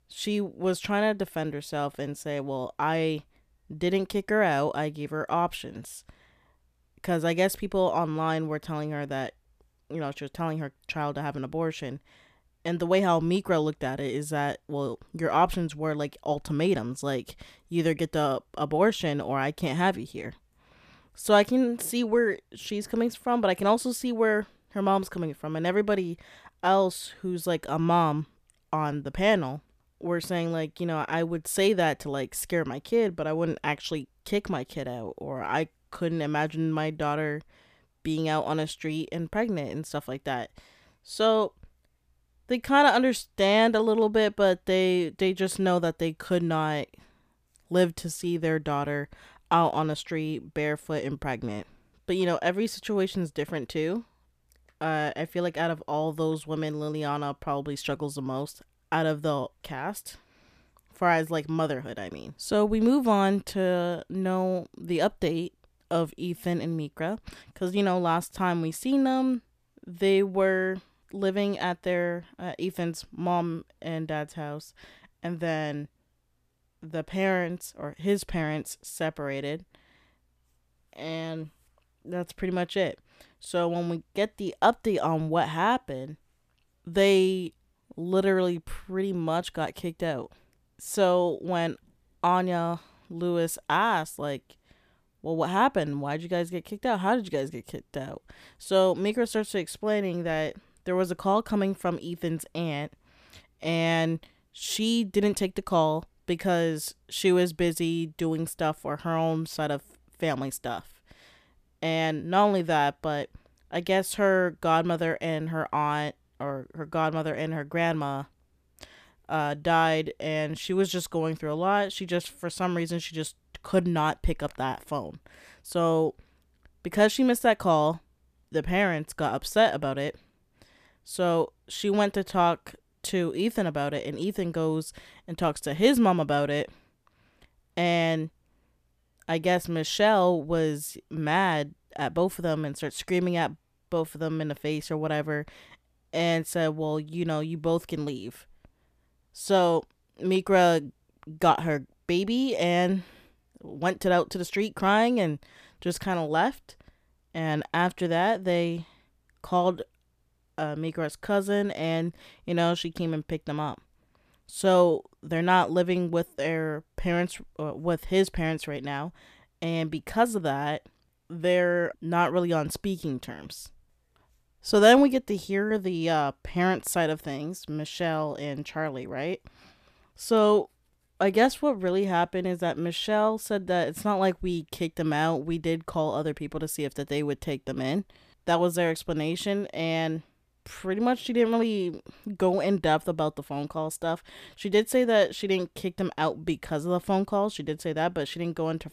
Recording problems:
none

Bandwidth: 14.5 kHz